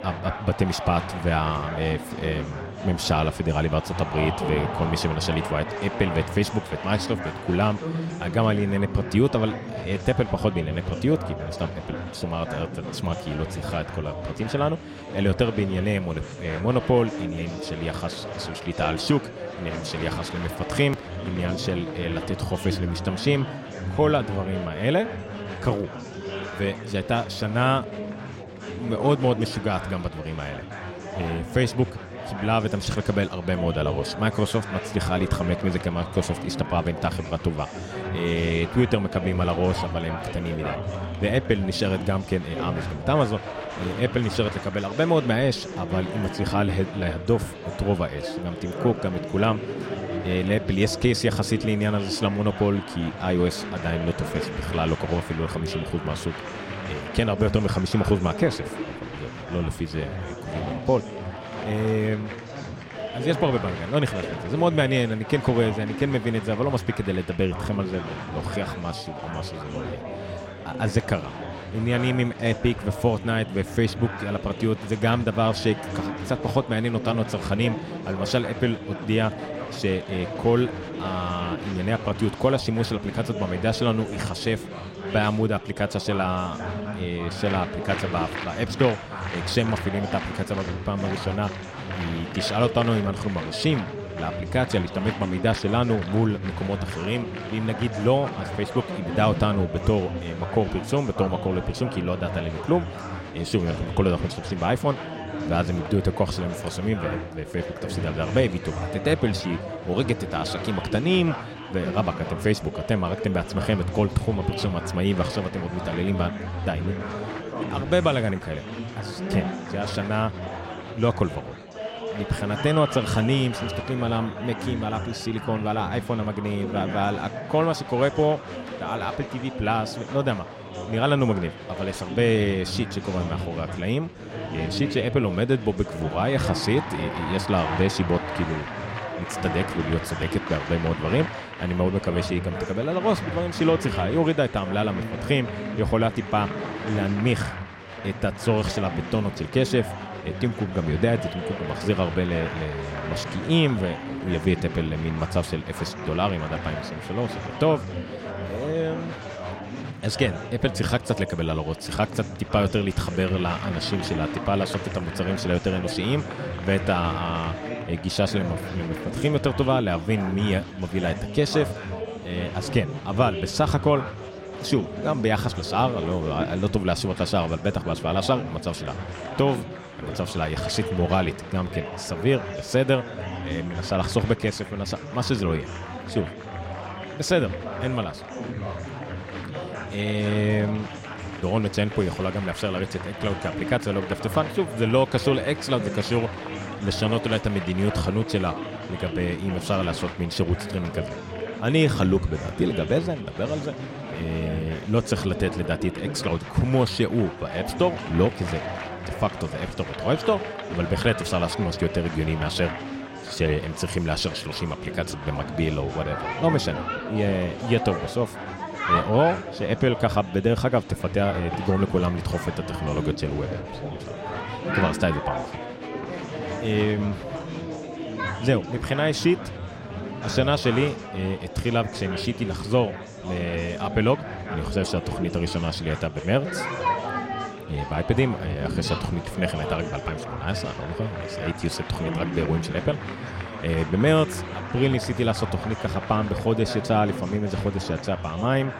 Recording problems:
chatter from many people; loud; throughout; 7 dB below the speech

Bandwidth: 16 kHz